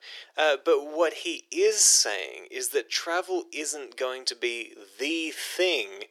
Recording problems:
thin; very; fading below 350 Hz

